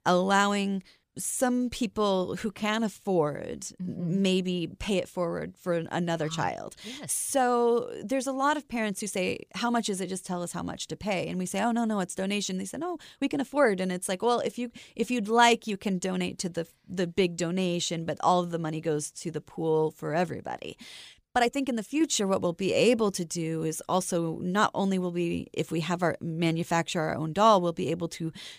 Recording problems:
uneven, jittery; strongly; from 1 to 22 s

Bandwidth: 15 kHz